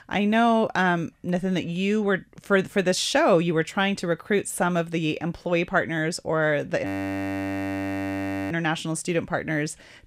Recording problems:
audio freezing; at 7 s for 1.5 s

